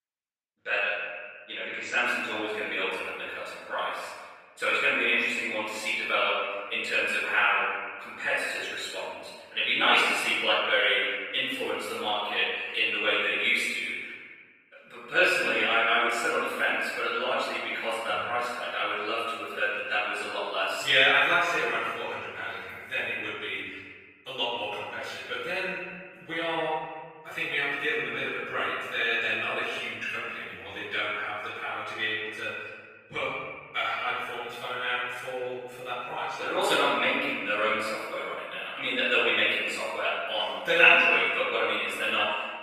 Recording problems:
room echo; strong; dies away in 1.5 s
off-mic speech; far
thin; somewhat; fading below 450 Hz
garbled, watery; slightly; nothing above 15 kHz

